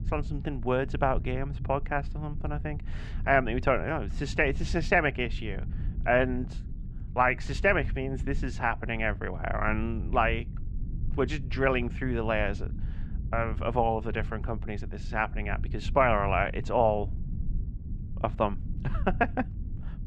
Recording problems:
muffled; slightly; fading above 2.5 kHz
low rumble; faint; throughout; 25 dB below the speech

